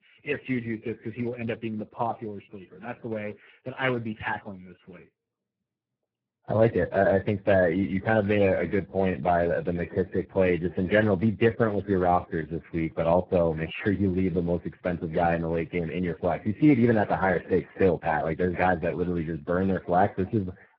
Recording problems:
garbled, watery; badly

